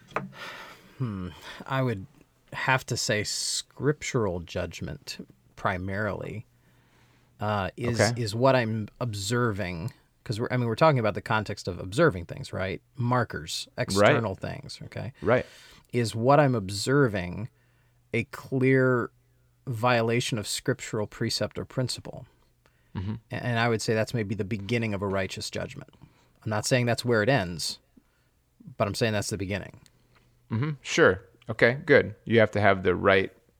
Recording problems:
none

